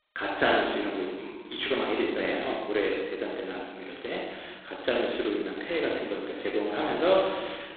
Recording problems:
phone-call audio; poor line; nothing above 4 kHz
room echo; noticeable; dies away in 1.2 s
off-mic speech; somewhat distant

